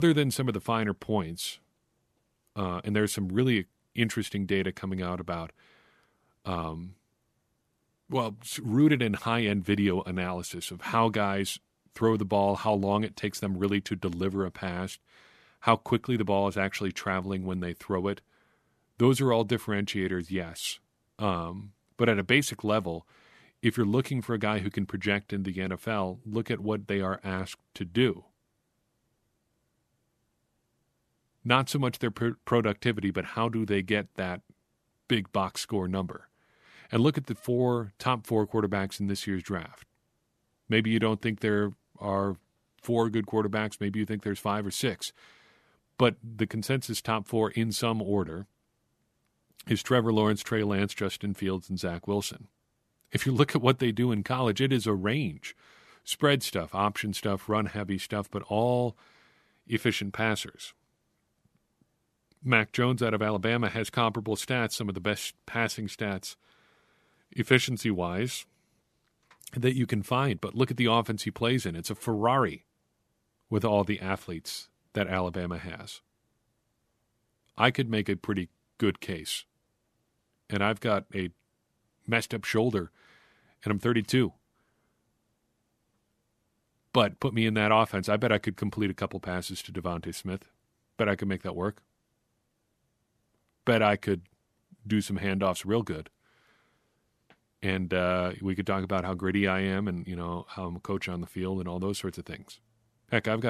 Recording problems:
abrupt cut into speech; at the start and the end

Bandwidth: 14 kHz